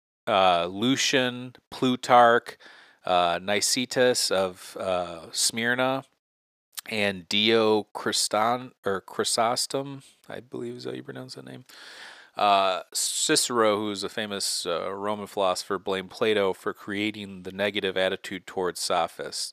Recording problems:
thin; somewhat; fading below 400 Hz

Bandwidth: 15 kHz